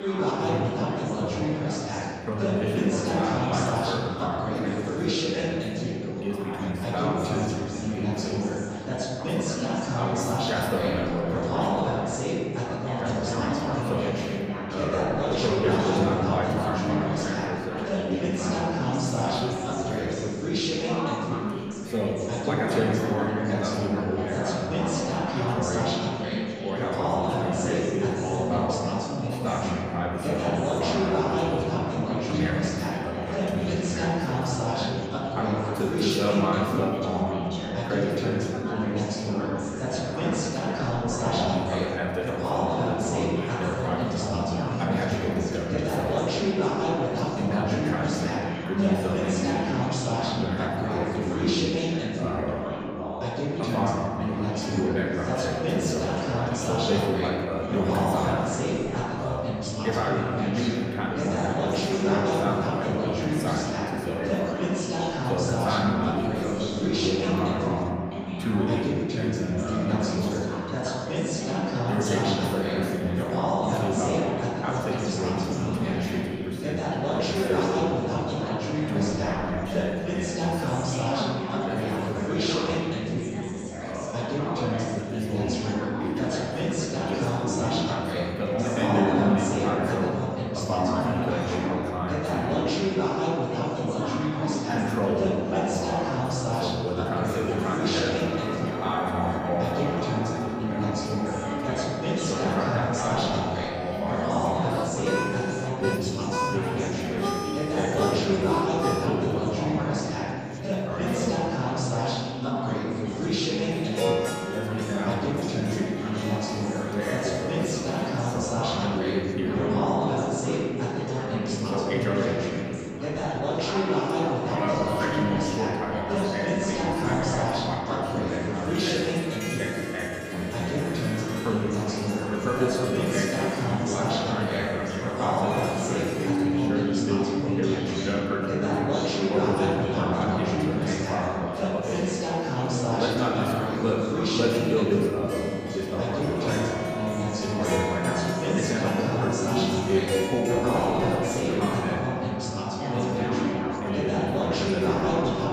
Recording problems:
off-mic speech; far
room echo; noticeable; dies away in 2.5 s
chatter from many people; very loud; throughout; 2 dB above the speech
background music; loud; from 1:38 on; 5 dB below the speech

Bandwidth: 15 kHz